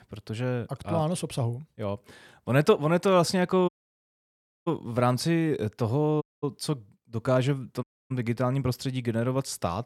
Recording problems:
audio cutting out; at 3.5 s for 1 s, at 6 s and at 8 s

